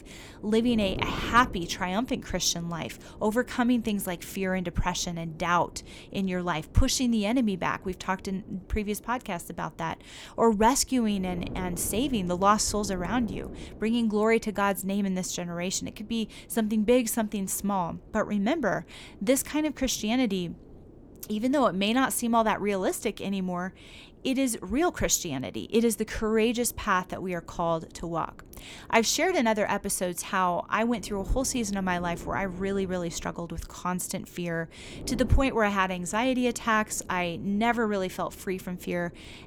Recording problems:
wind noise on the microphone; occasional gusts; 25 dB below the speech

